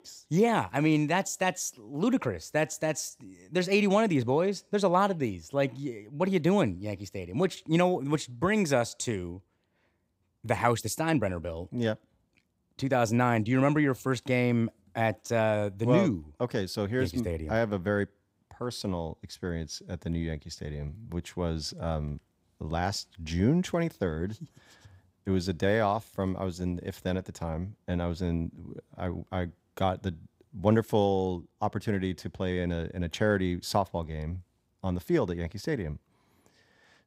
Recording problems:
none

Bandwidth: 15.5 kHz